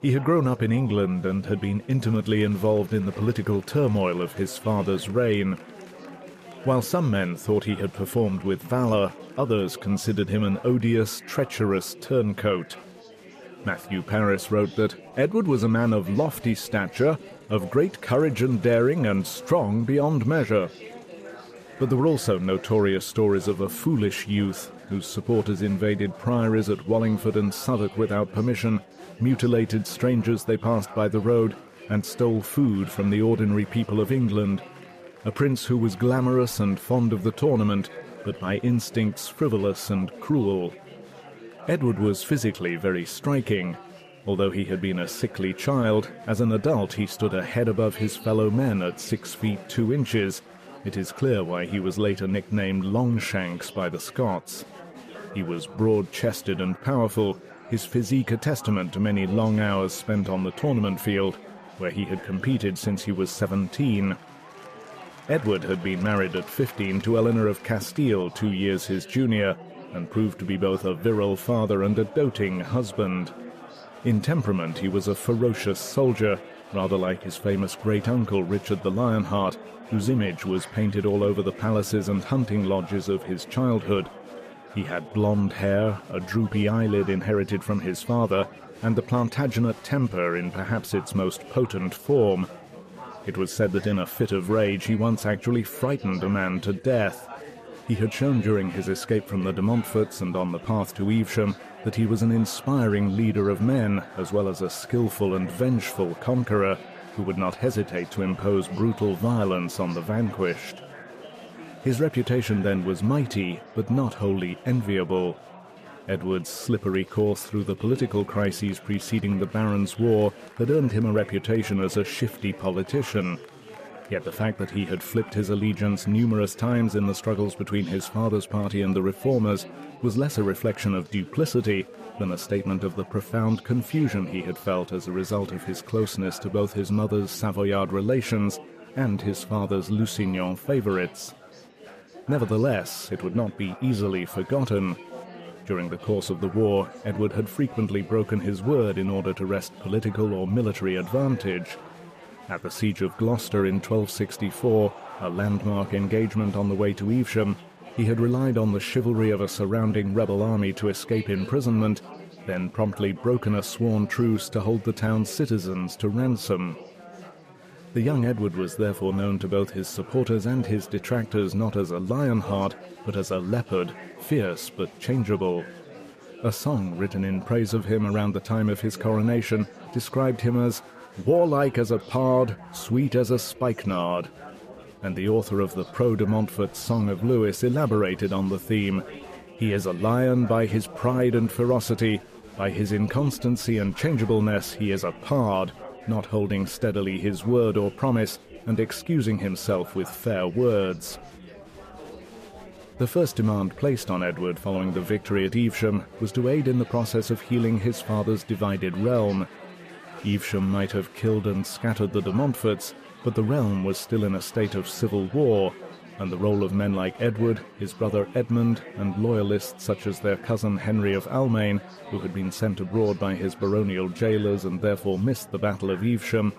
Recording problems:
chatter from many people; noticeable; throughout; 20 dB below the speech

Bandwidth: 14.5 kHz